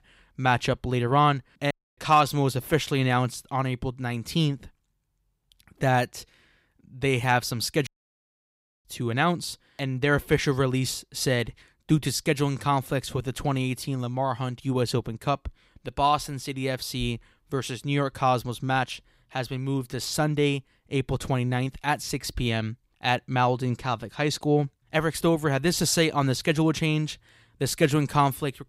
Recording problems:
audio cutting out; at 1.5 s and at 8 s for 1 s

